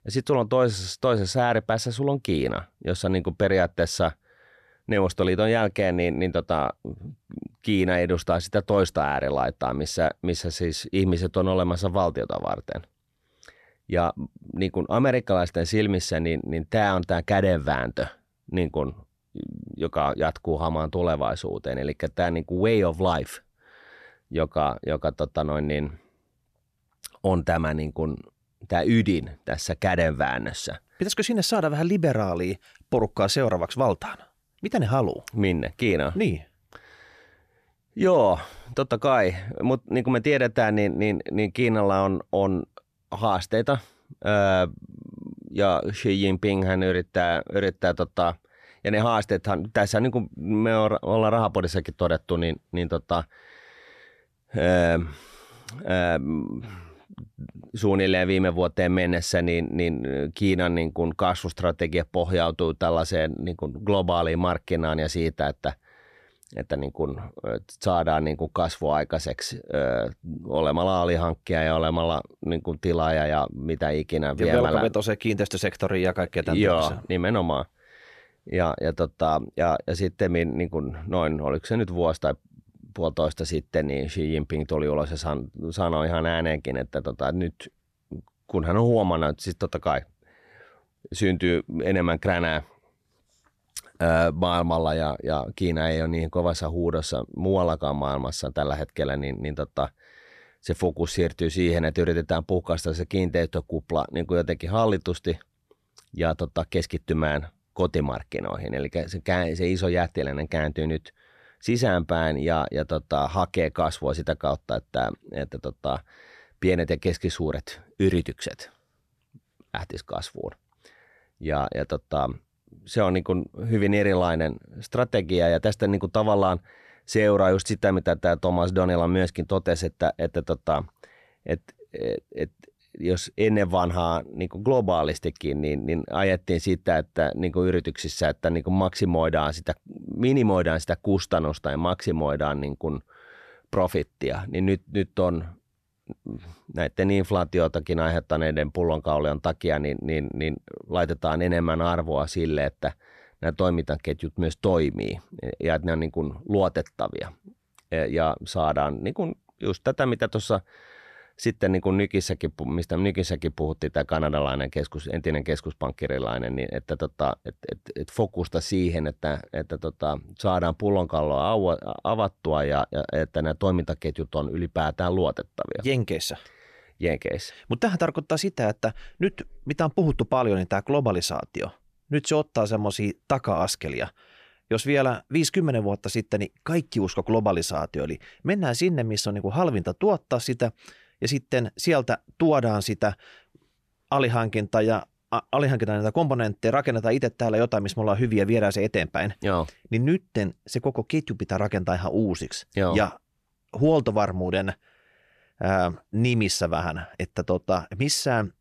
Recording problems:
none

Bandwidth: 14.5 kHz